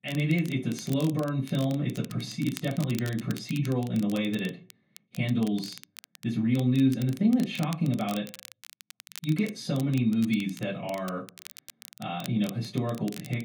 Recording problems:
off-mic speech; far
room echo; slight; dies away in 0.3 s
crackle, like an old record; noticeable; 20 dB below the speech

